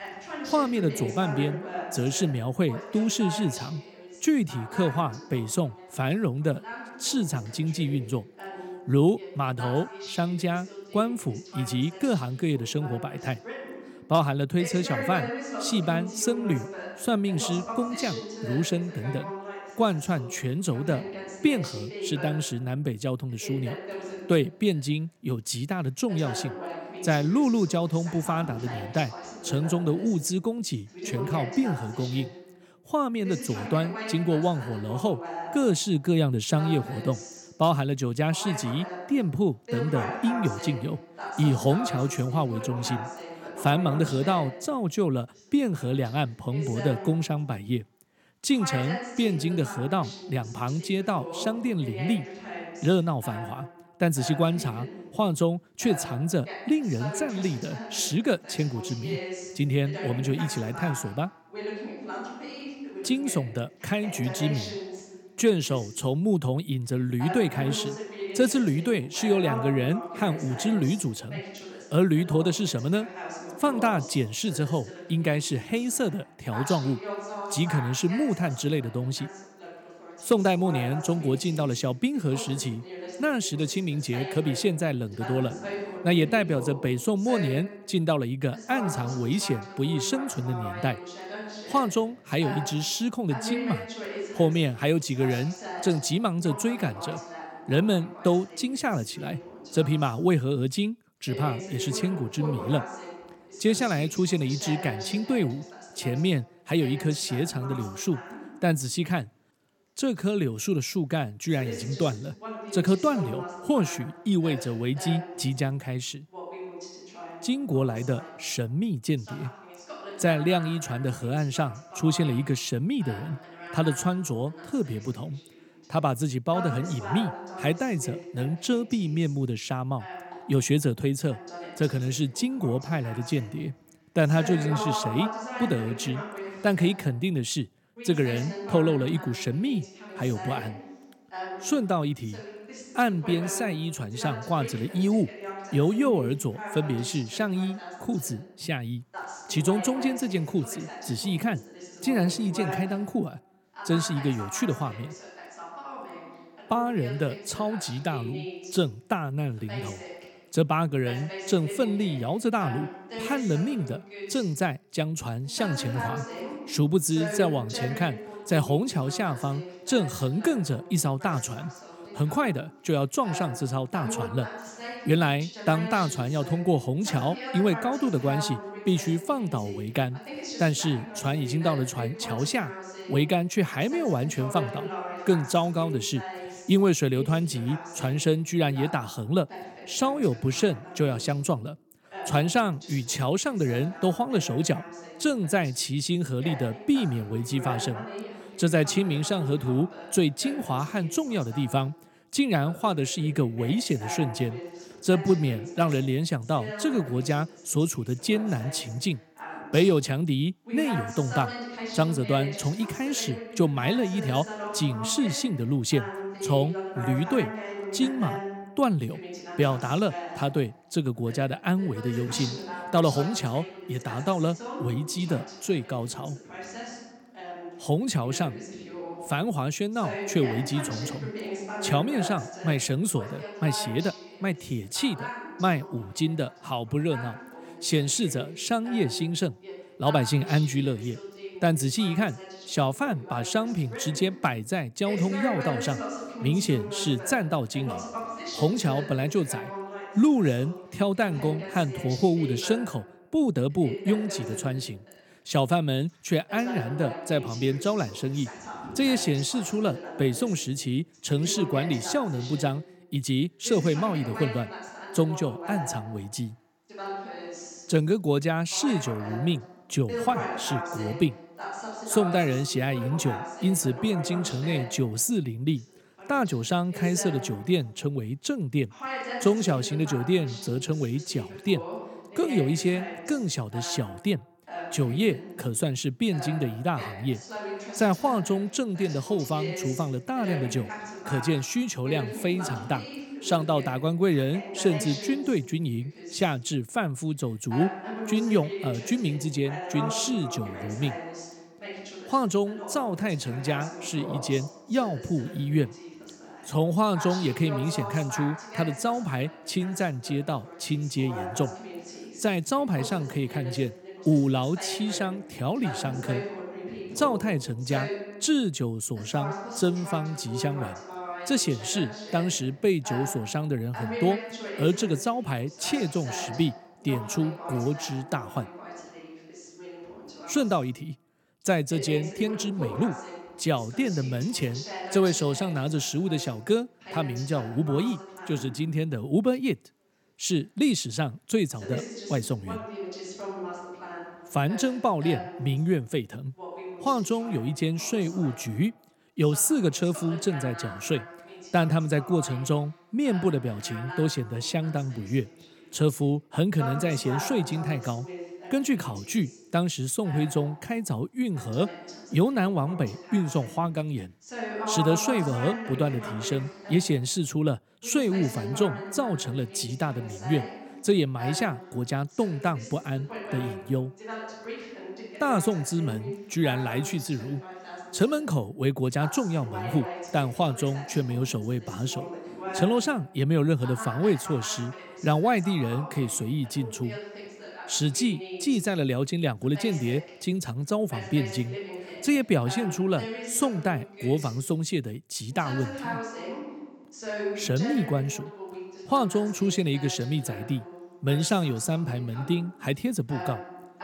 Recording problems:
voice in the background; noticeable; throughout; 10 dB below the speech
uneven, jittery; strongly; from 50 s to 5:33

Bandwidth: 17 kHz